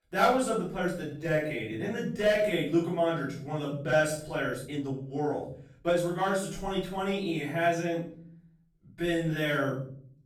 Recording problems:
off-mic speech; far
room echo; noticeable; dies away in 0.6 s
uneven, jittery; strongly; from 1 to 9.5 s

